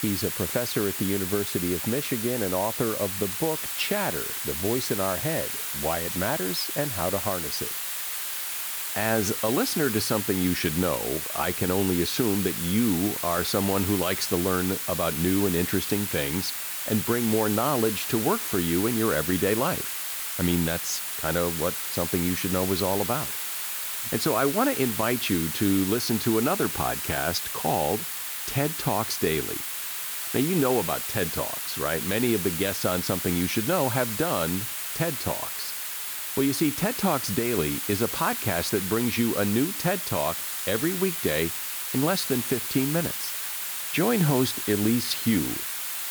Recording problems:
hiss; loud; throughout; 2 dB below the speech

